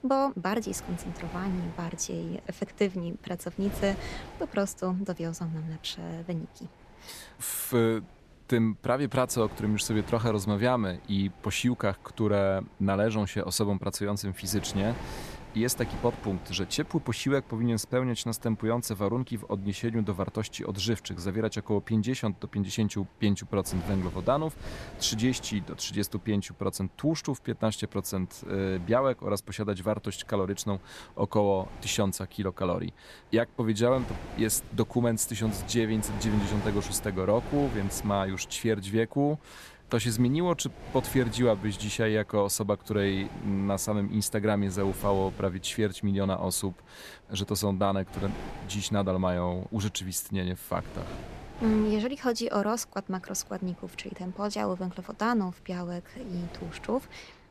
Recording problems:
wind noise on the microphone; occasional gusts; 15 dB below the speech

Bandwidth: 14 kHz